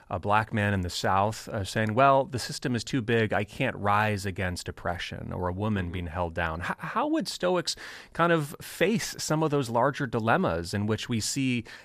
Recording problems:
none

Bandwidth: 14.5 kHz